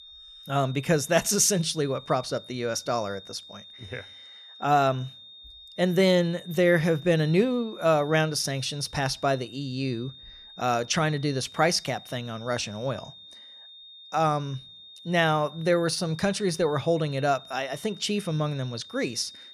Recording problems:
high-pitched whine; noticeable; throughout; 3.5 kHz, 20 dB below the speech

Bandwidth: 14.5 kHz